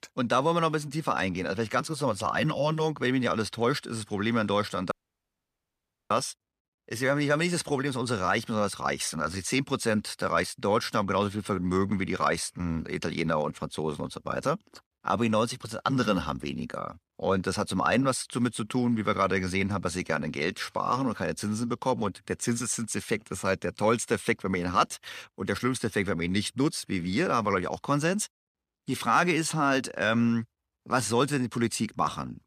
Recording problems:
audio cutting out; at 5 s for 1 s

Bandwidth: 14.5 kHz